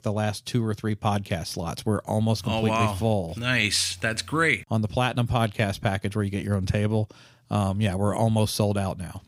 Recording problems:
none

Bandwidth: 15.5 kHz